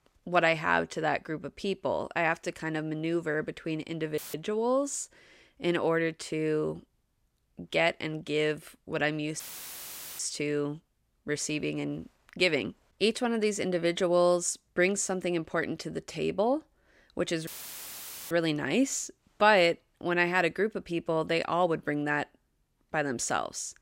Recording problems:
audio cutting out; filled with static; at 4 s, at 9.5 s for 1 s and at 17 s for 1 s

